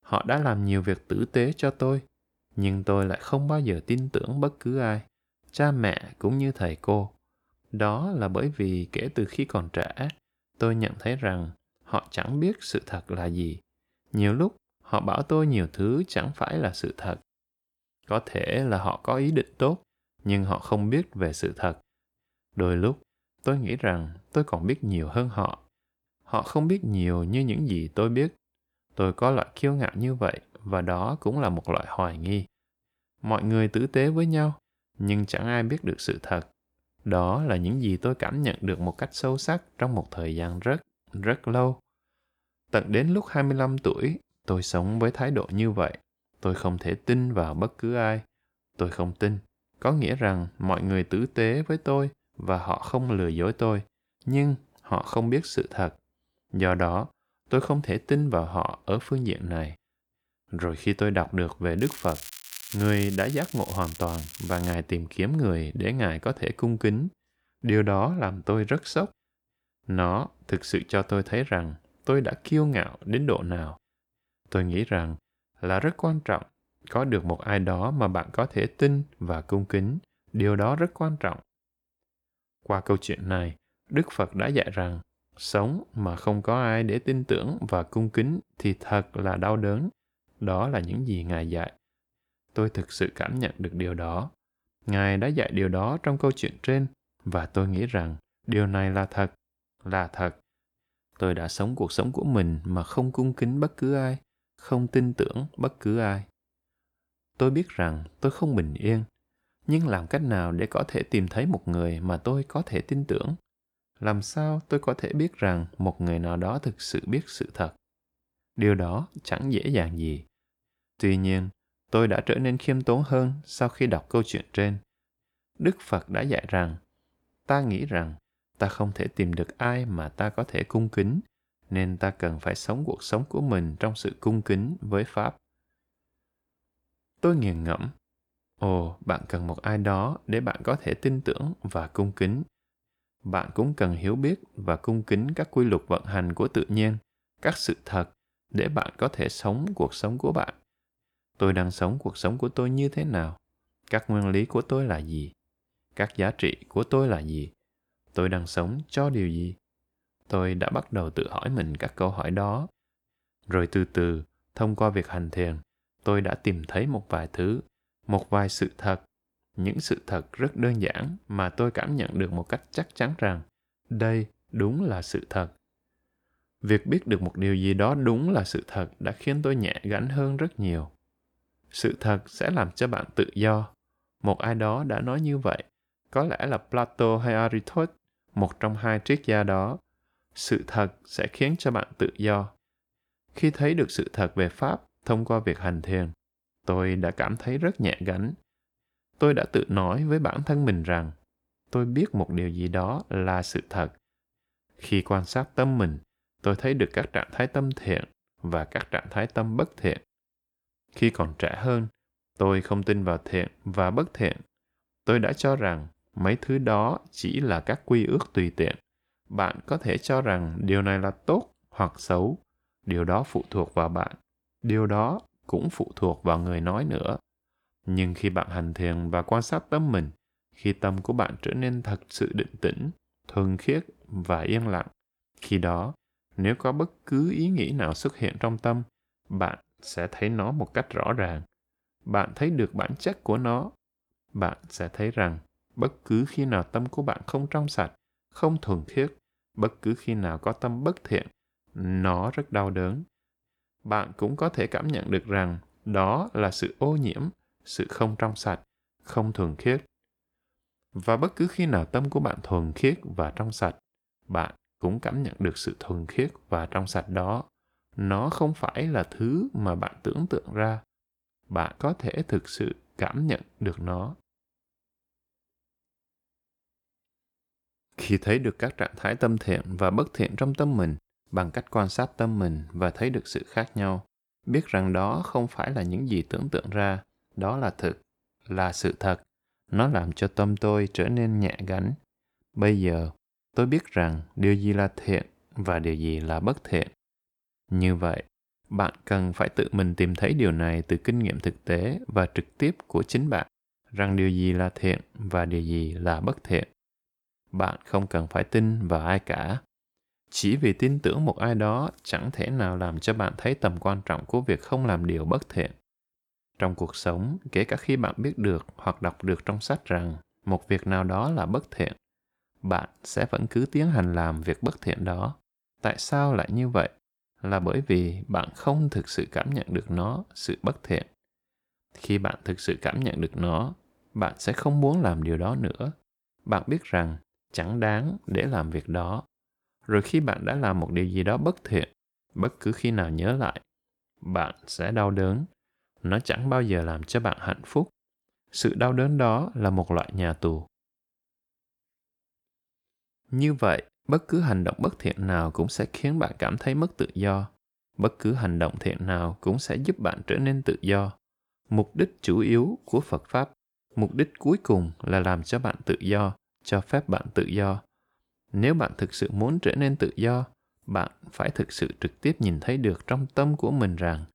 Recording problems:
crackling; noticeable; from 1:02 to 1:05; 10 dB below the speech

